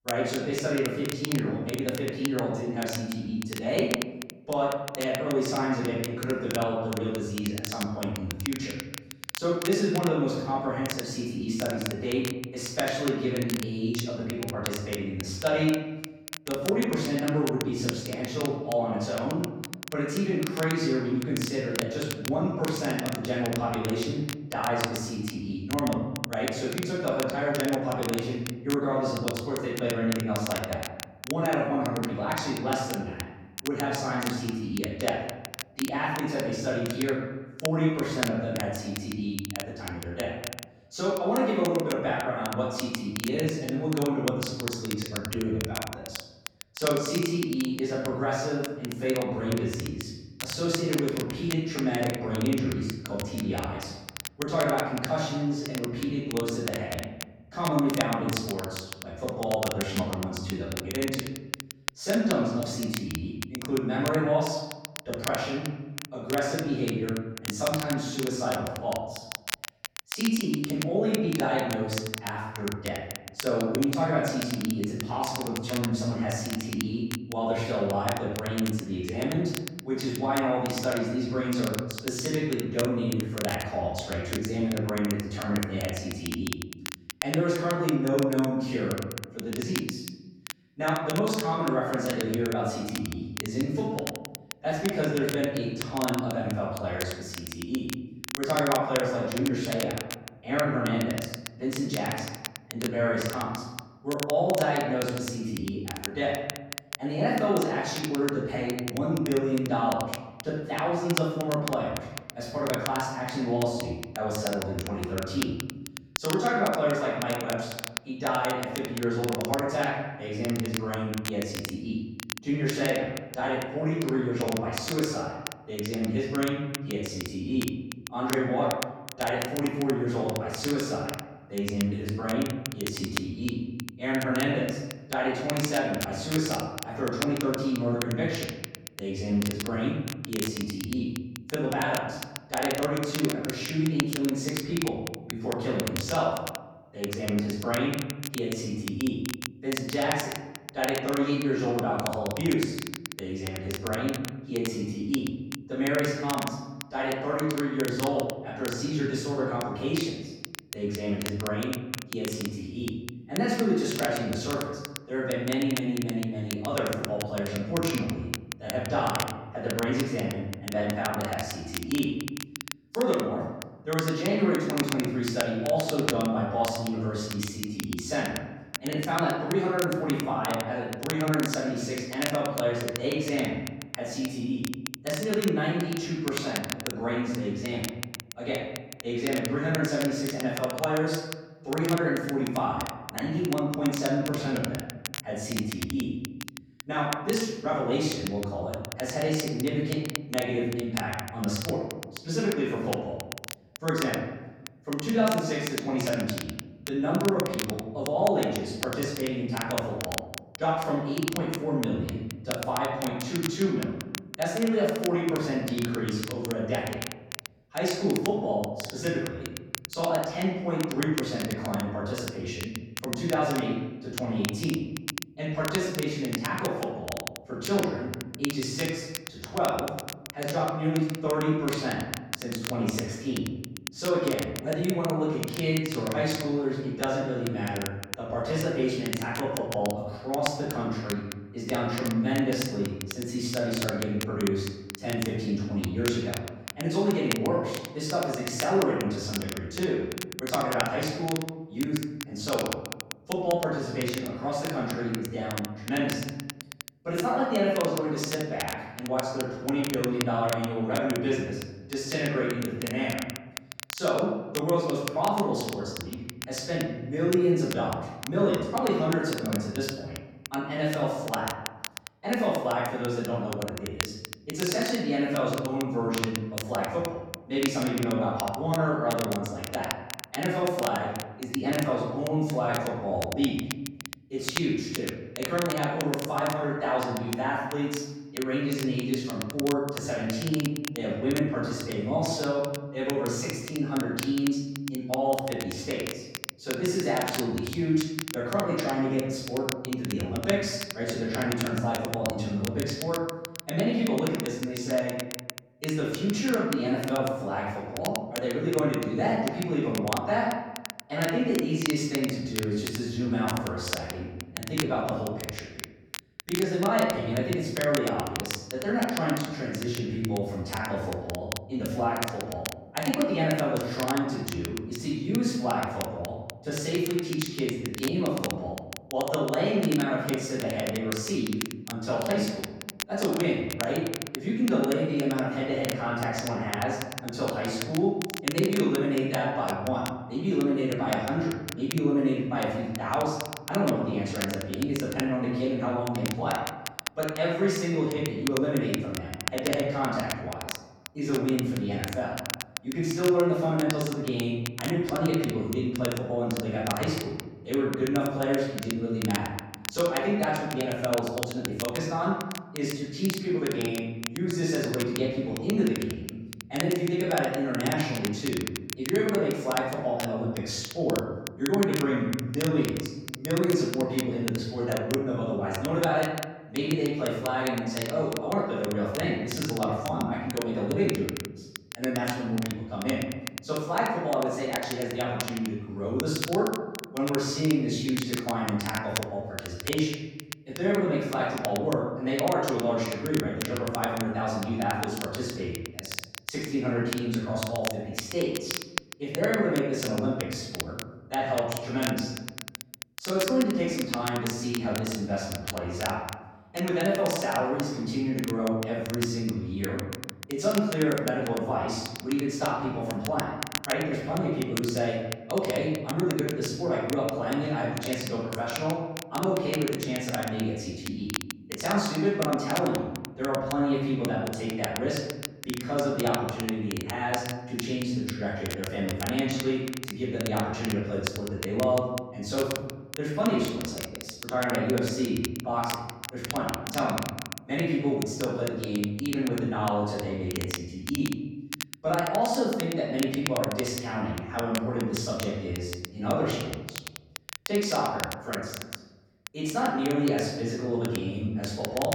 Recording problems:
room echo; strong; dies away in 1.1 s
off-mic speech; far
crackle, like an old record; loud; 9 dB below the speech

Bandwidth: 17.5 kHz